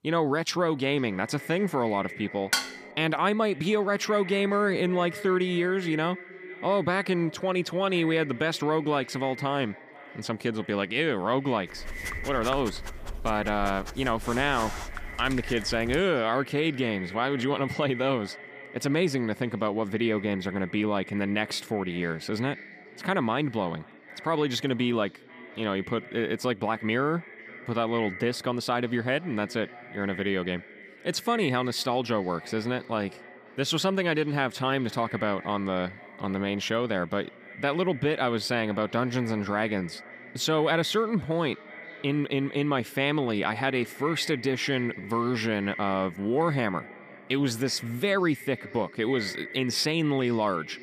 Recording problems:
echo of what is said; noticeable; throughout; 500 ms later, 15 dB below the speech
clattering dishes; loud; at 2.5 s; peak level with the speech
dog barking; noticeable; from 12 to 16 s; peak 8 dB below the speech

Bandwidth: 15 kHz